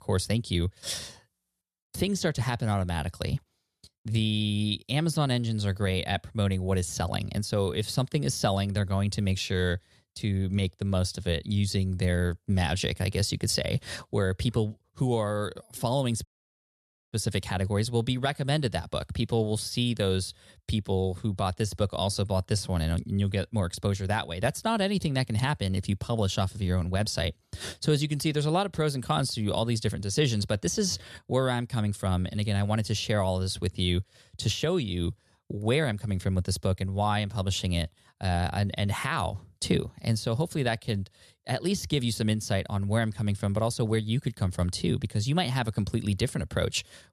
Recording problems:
audio cutting out; at 16 s for 1 s

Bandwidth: 13.5 kHz